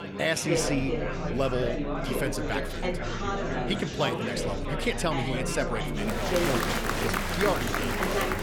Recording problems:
chatter from many people; very loud; throughout; 1 dB above the speech

